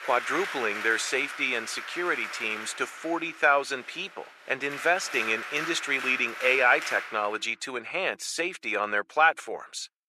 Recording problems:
thin; very; fading below 450 Hz
crowd noise; loud; until 7 s; 9 dB below the speech

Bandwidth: 13.5 kHz